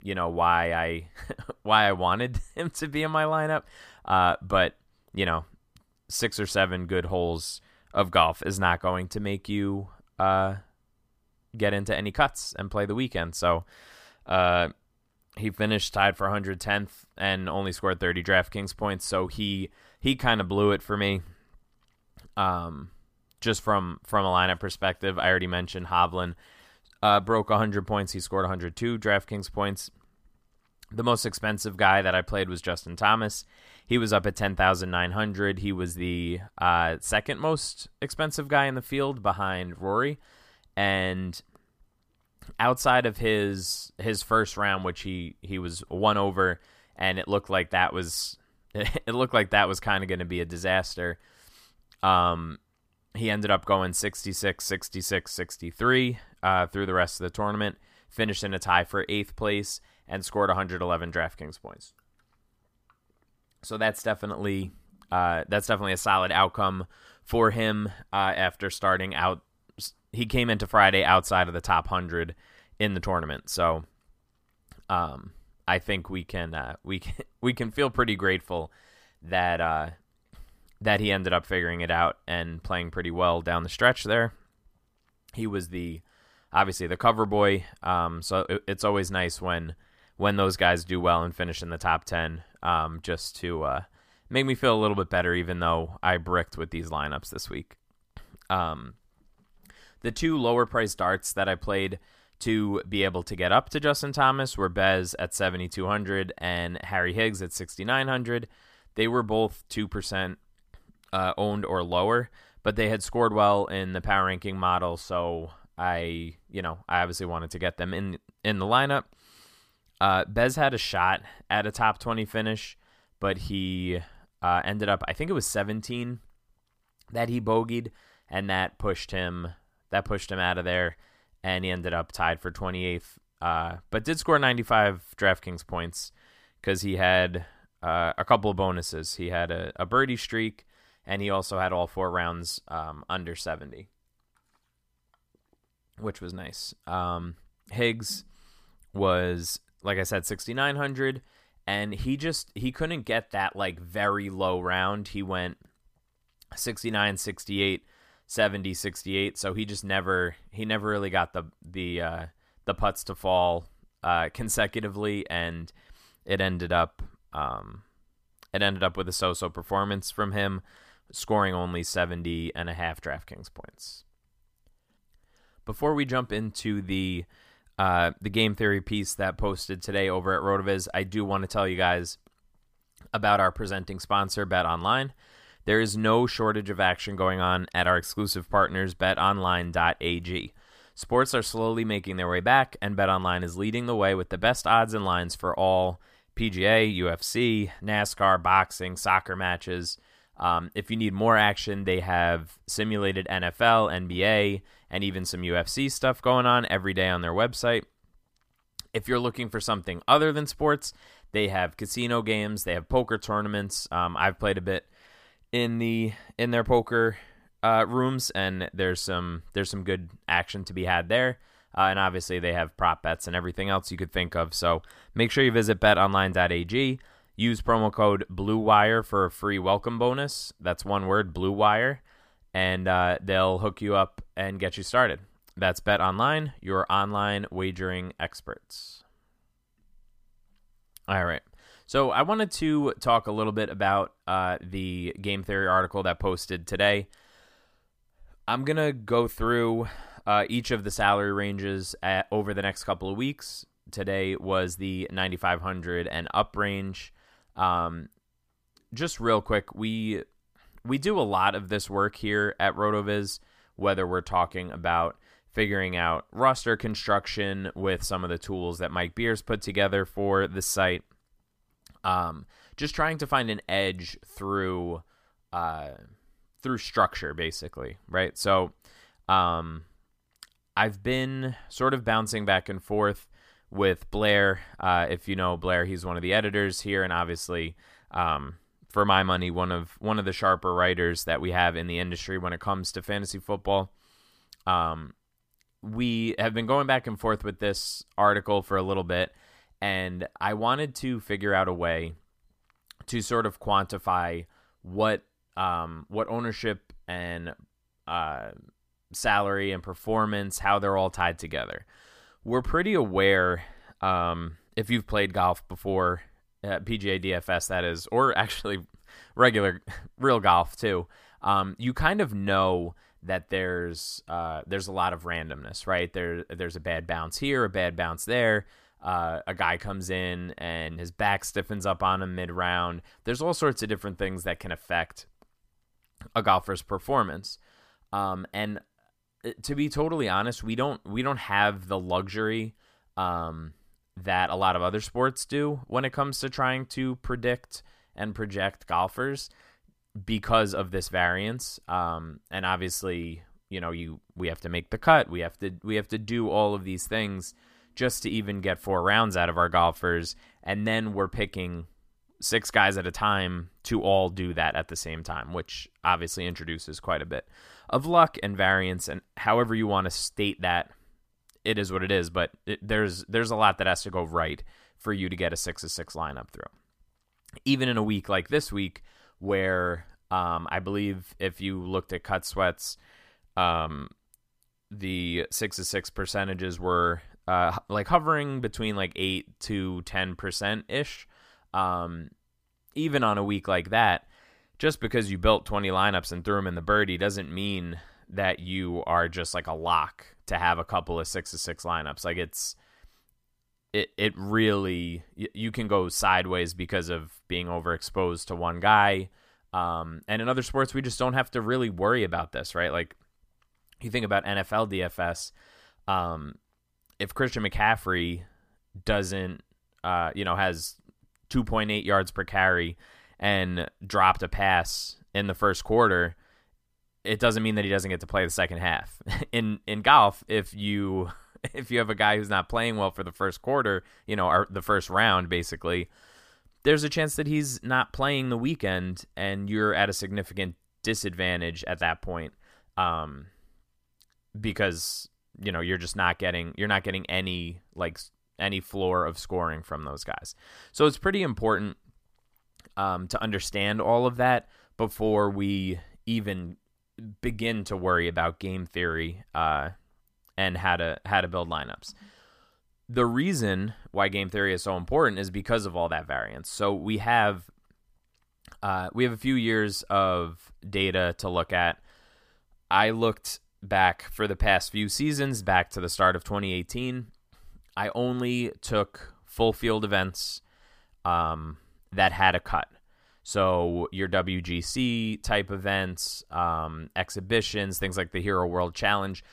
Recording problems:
none

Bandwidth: 15 kHz